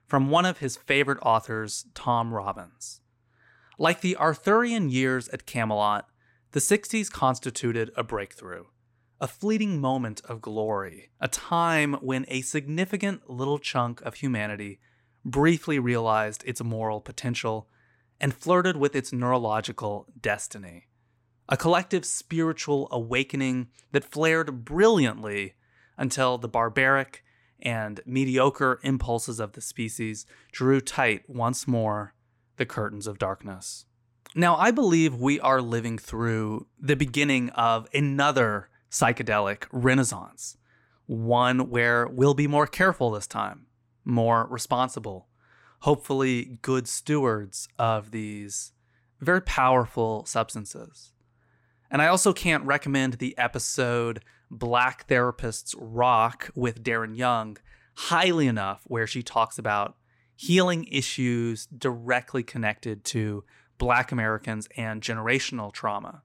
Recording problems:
none

